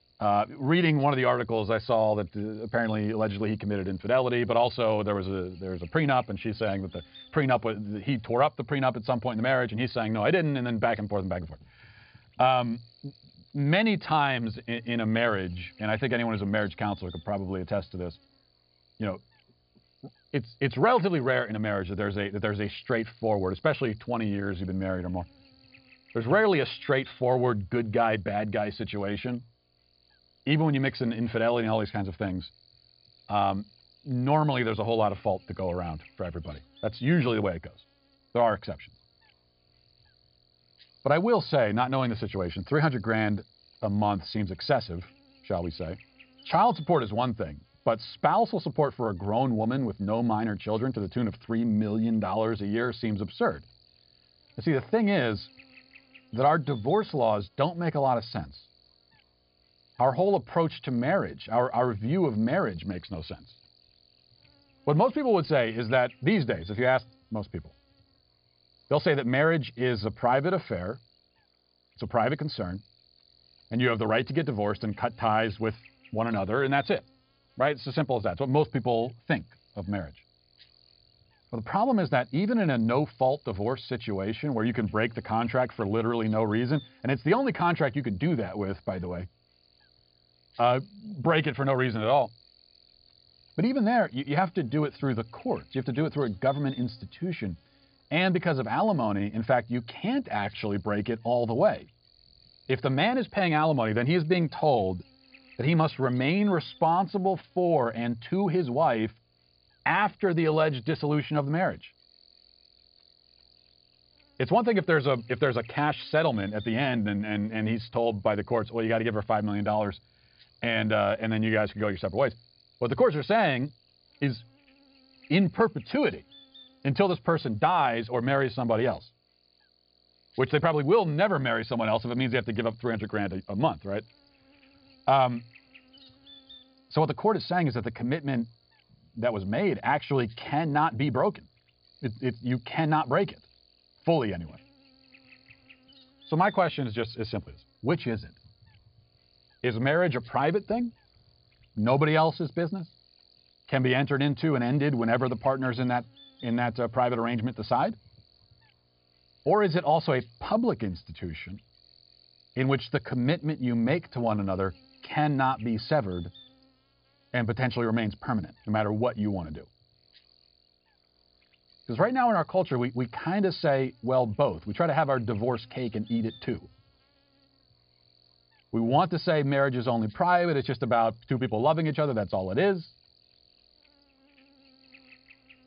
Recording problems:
high frequencies cut off; severe; nothing above 5 kHz
electrical hum; faint; throughout; 60 Hz, 30 dB below the speech

